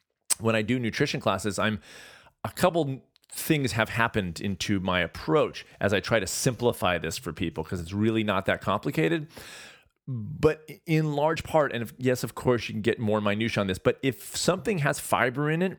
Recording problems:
uneven, jittery; strongly; from 2.5 to 15 s

